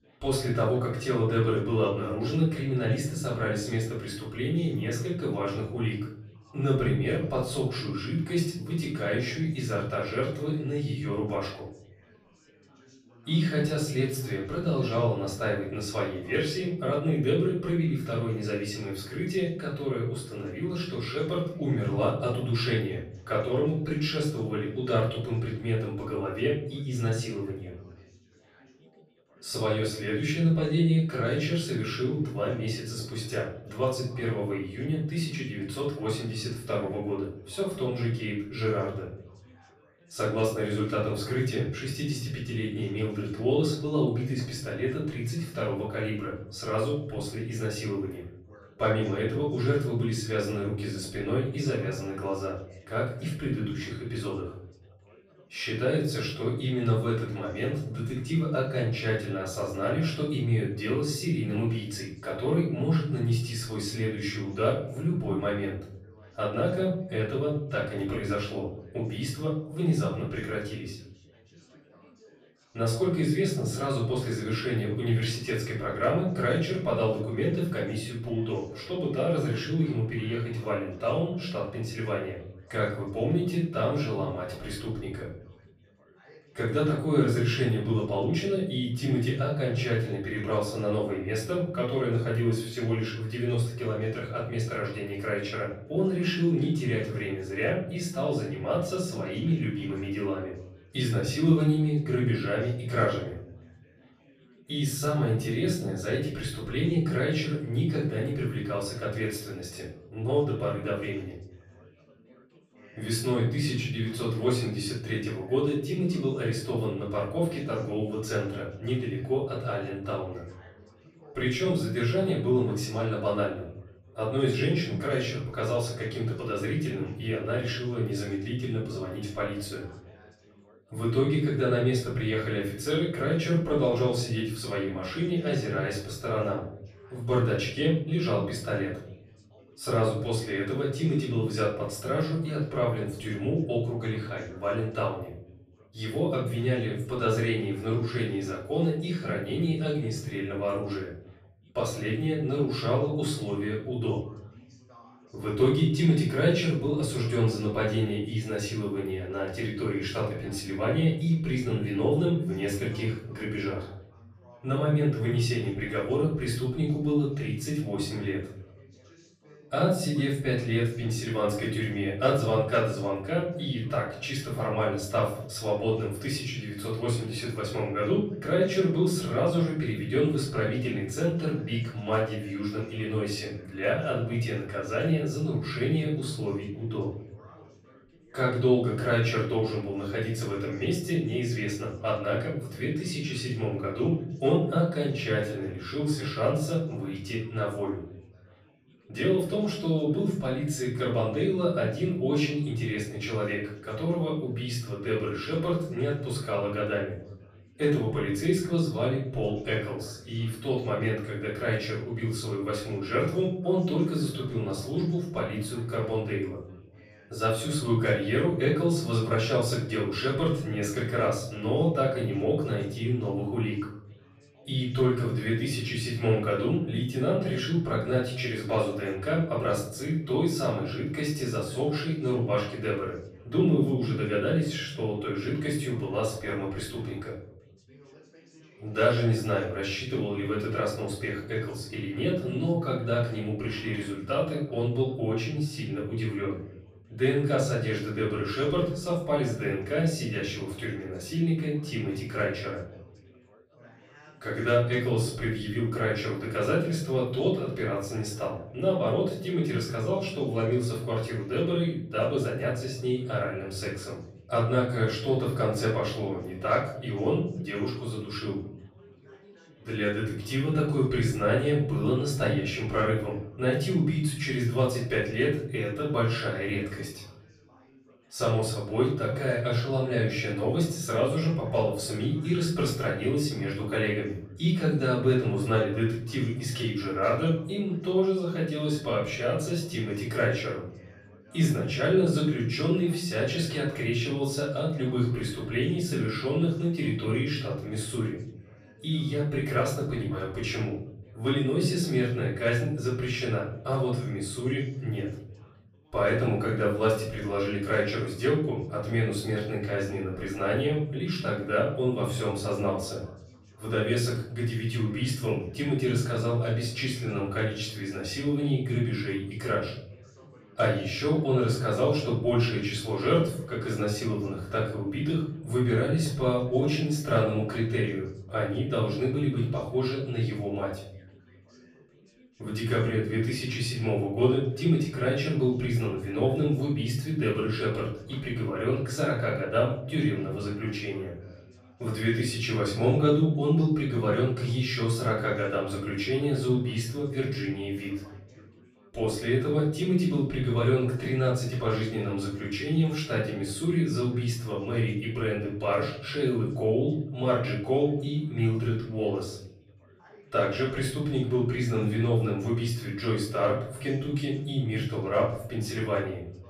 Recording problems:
off-mic speech; far
room echo; noticeable; dies away in 0.9 s
background chatter; faint; throughout; 3 voices, 25 dB below the speech

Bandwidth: 14.5 kHz